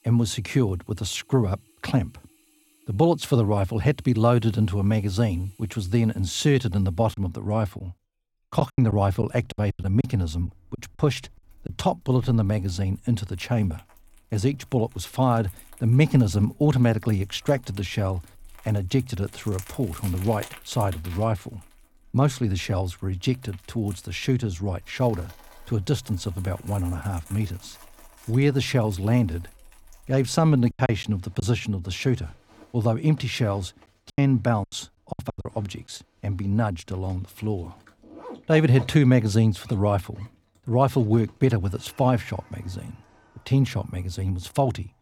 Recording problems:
household noises; faint; throughout; 25 dB below the speech
choppy; very; from 7 to 12 s, at 31 s and from 34 to 35 s; 15% of the speech affected

